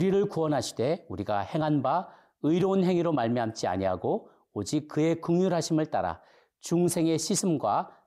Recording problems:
abrupt cut into speech; at the start

